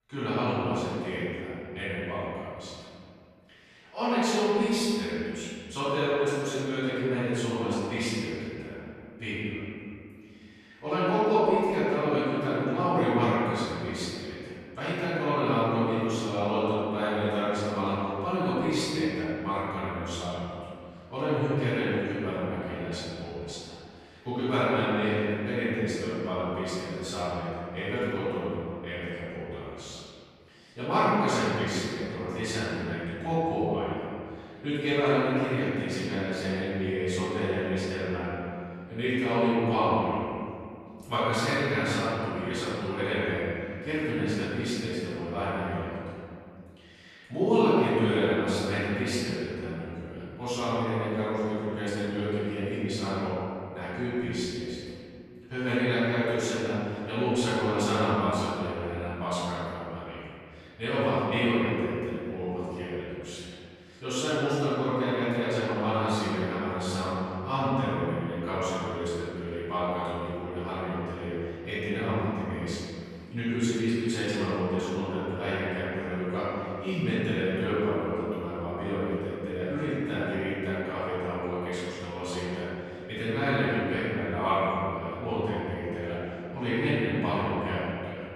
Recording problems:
room echo; strong; dies away in 2.2 s
off-mic speech; far

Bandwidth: 13.5 kHz